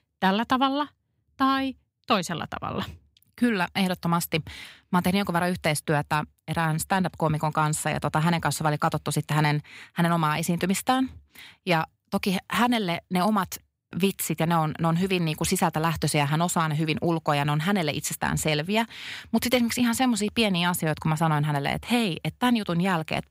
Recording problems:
none

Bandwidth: 15.5 kHz